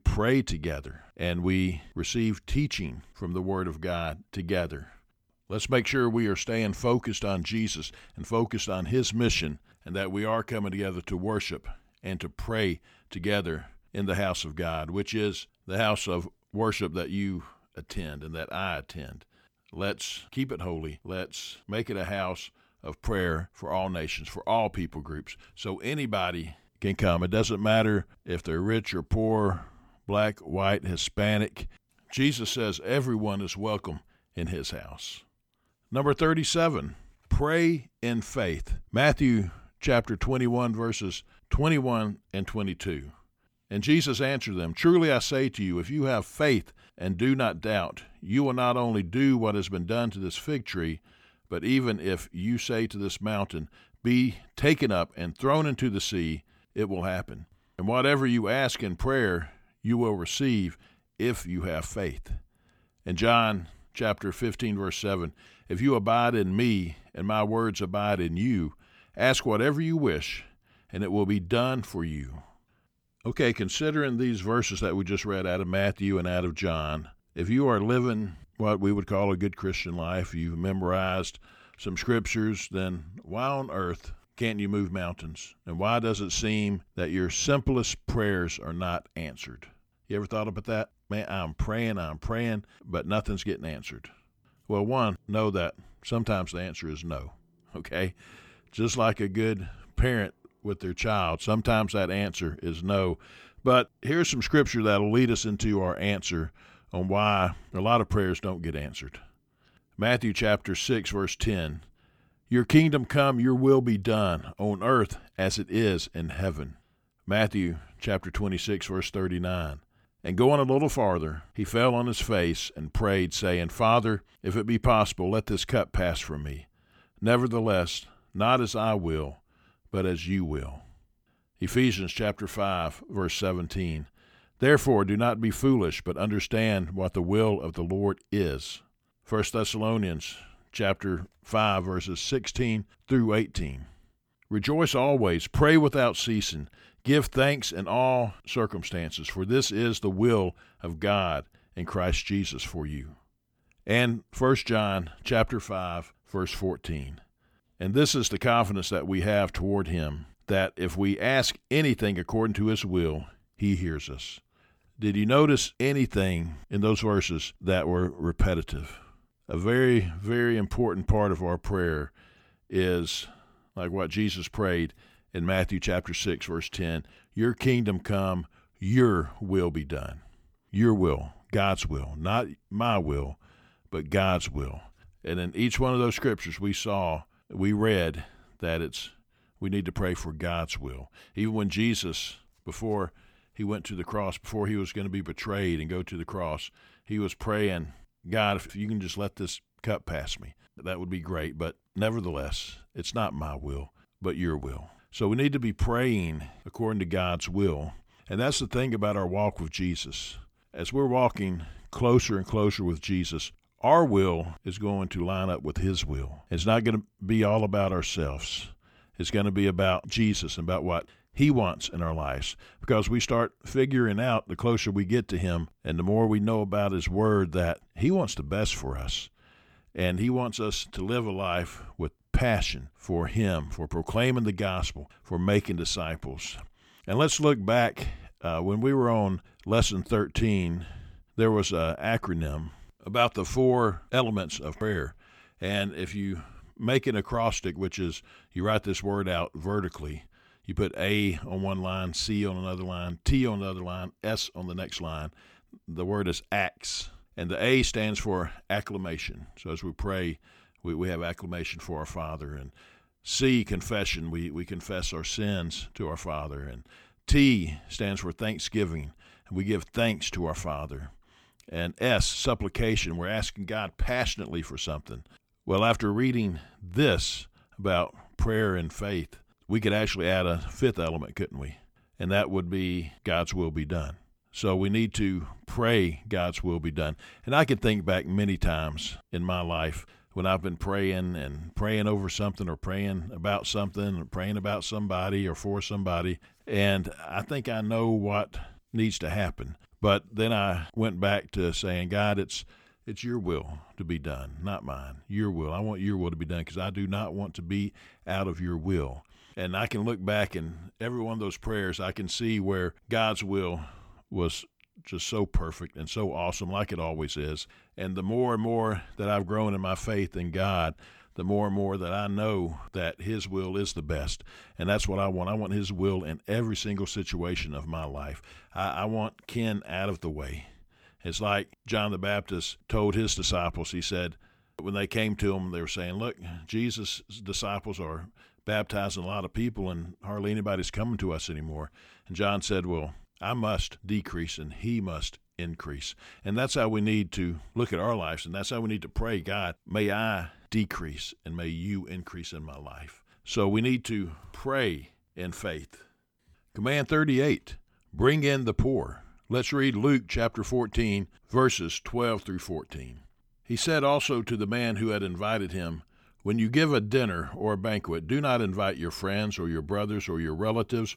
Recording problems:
none

